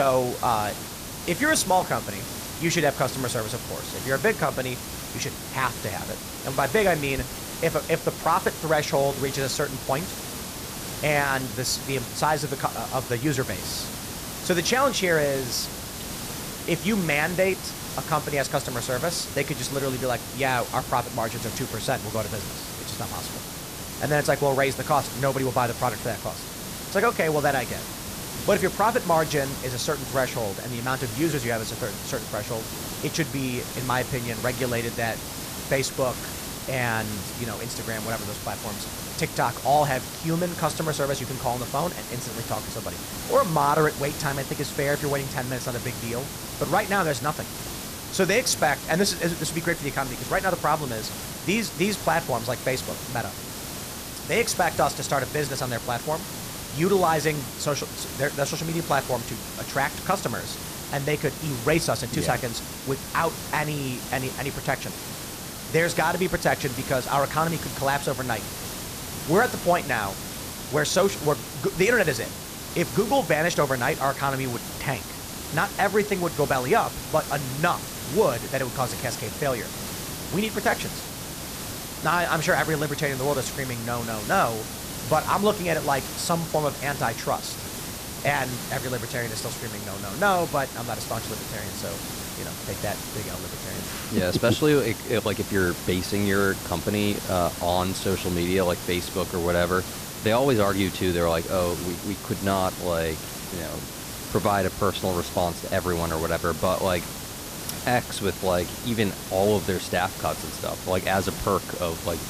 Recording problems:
hiss; loud; throughout; 7 dB below the speech
abrupt cut into speech; at the start

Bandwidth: 14.5 kHz